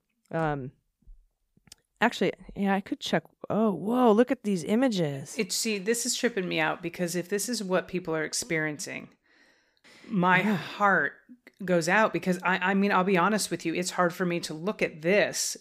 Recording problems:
none

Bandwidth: 15 kHz